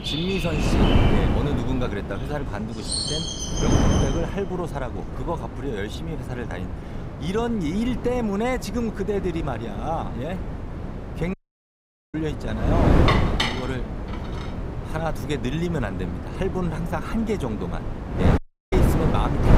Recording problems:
wind noise on the microphone; heavy; 1 dB below the speech
animal sounds; loud; until 4 s; 1 dB below the speech
audio cutting out; at 11 s for 1 s and at 18 s
clattering dishes; loud; from 13 to 14 s; peak 5 dB above the speech

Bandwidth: 15.5 kHz